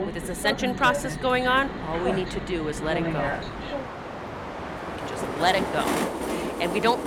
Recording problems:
train or aircraft noise; loud; throughout; 4 dB below the speech

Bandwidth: 17 kHz